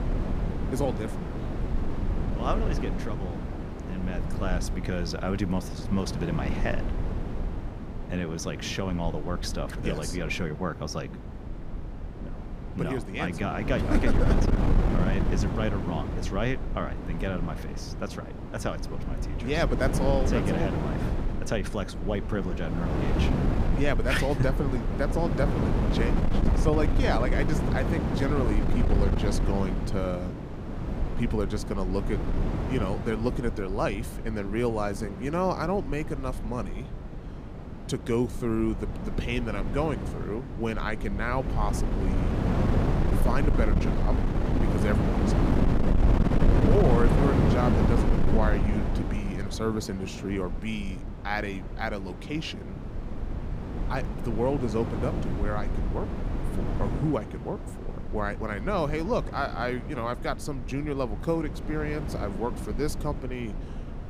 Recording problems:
wind noise on the microphone; heavy; 4 dB below the speech

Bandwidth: 15 kHz